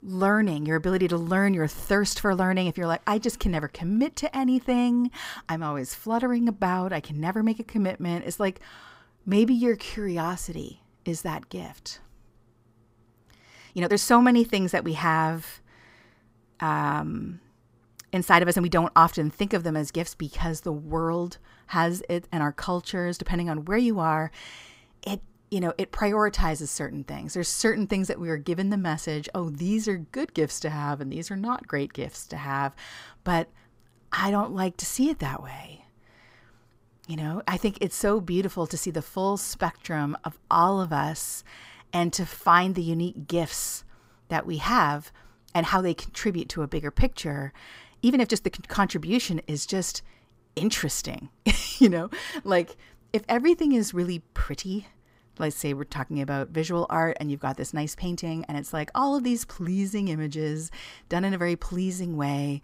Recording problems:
uneven, jittery; strongly; from 6 to 59 s

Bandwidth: 15.5 kHz